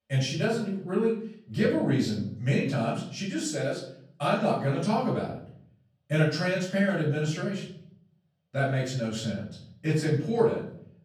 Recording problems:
off-mic speech; far
room echo; noticeable; dies away in 0.6 s

